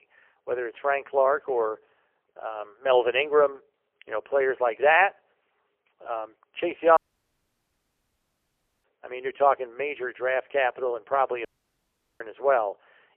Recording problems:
phone-call audio; poor line; nothing above 3 kHz
audio cutting out; at 7 s for 2 s and at 11 s for 1 s

